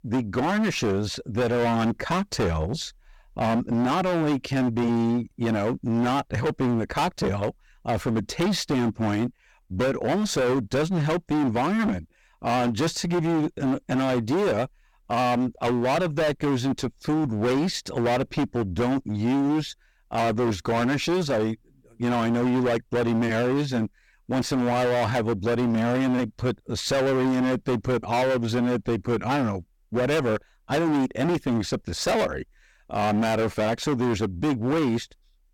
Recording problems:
distortion; heavy; 27% of the sound clipped

